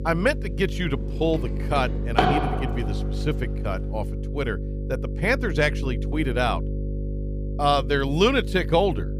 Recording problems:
household noises; loud; until 4 s; 3 dB below the speech
electrical hum; noticeable; throughout; 50 Hz, 15 dB below the speech

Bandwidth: 15 kHz